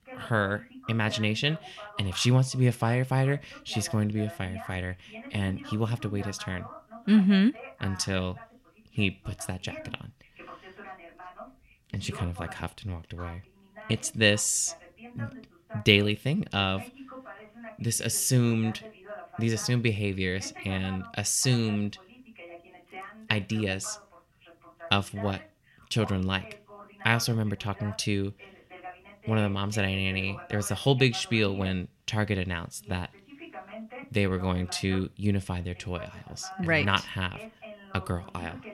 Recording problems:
voice in the background; noticeable; throughout; 20 dB below the speech

